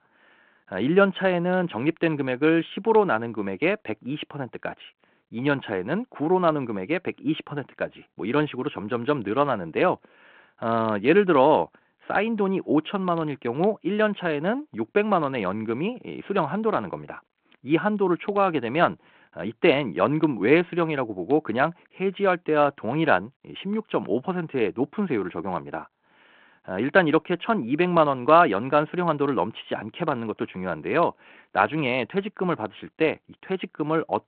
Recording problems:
phone-call audio

